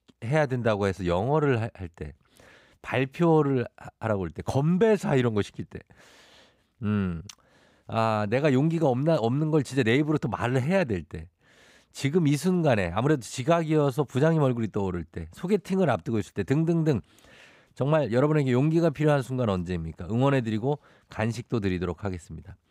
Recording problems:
none

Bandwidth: 15.5 kHz